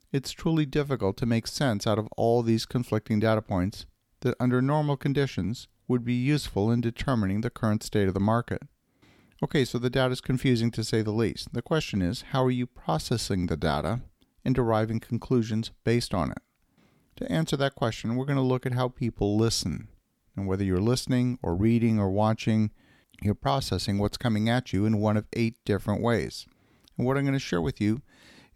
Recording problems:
none

